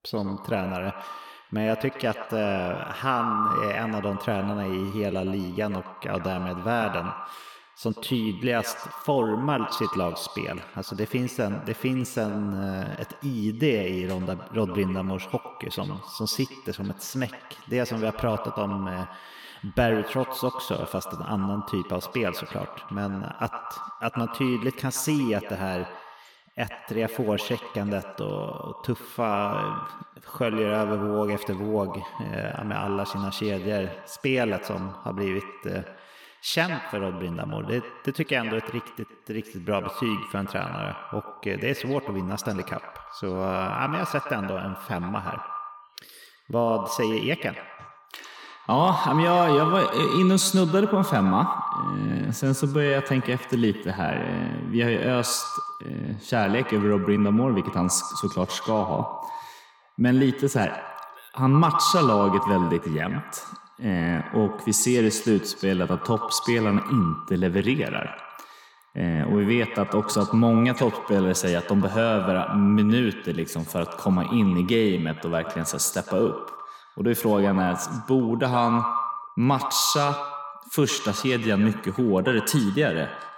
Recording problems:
echo of what is said; strong; throughout; 110 ms later, 9 dB below the speech

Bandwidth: 17.5 kHz